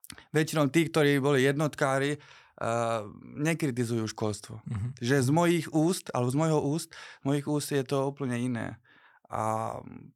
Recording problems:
none

